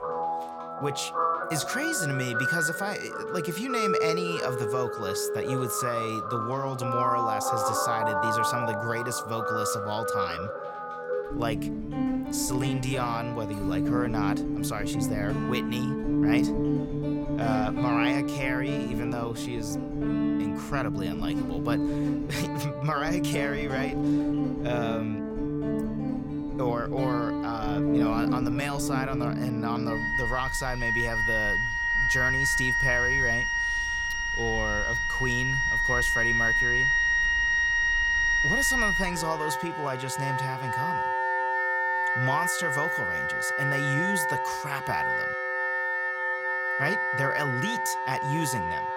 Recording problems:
background music; very loud; throughout; 5 dB above the speech

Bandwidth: 16.5 kHz